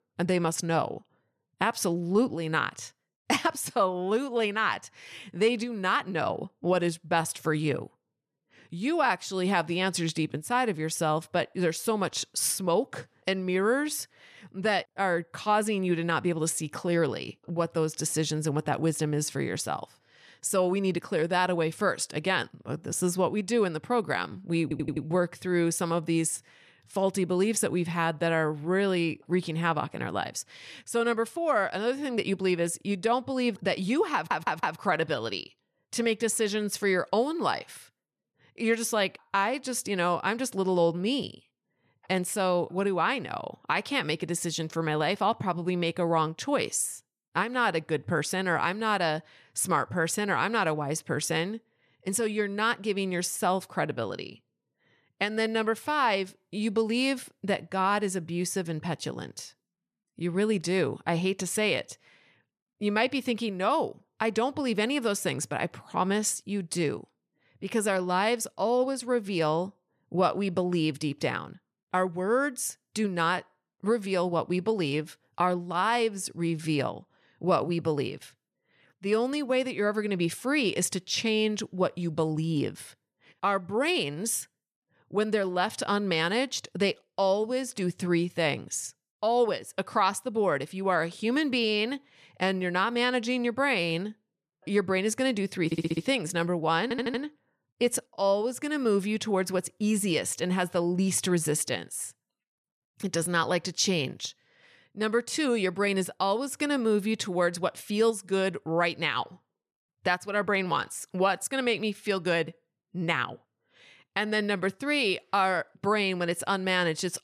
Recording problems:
audio stuttering; 4 times, first at 25 s

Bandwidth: 14 kHz